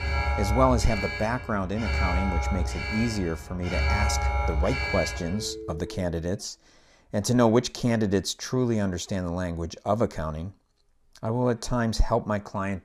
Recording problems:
alarms or sirens; loud; until 6 s; 2 dB below the speech

